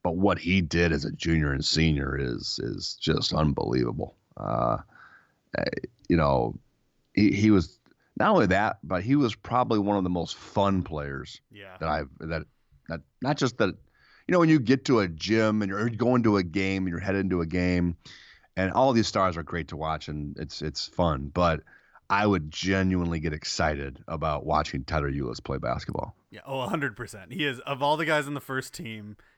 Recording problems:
none

